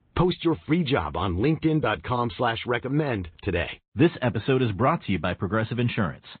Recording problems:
high frequencies cut off; severe; nothing above 4 kHz
garbled, watery; slightly

